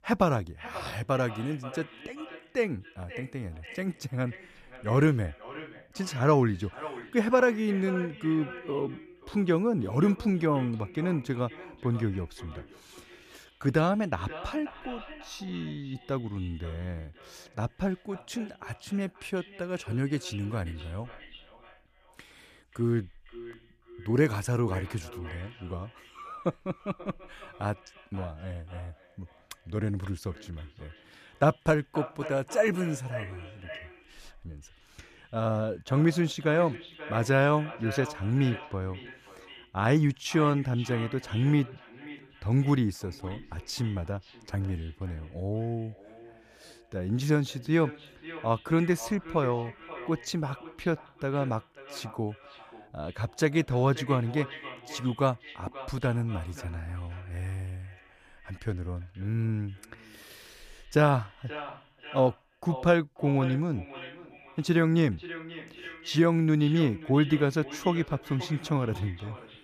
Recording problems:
echo of what is said; noticeable; throughout; 530 ms later, 15 dB below the speech

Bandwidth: 14.5 kHz